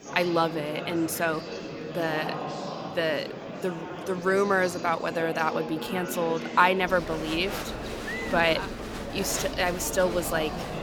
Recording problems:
murmuring crowd; loud; throughout; 7 dB below the speech

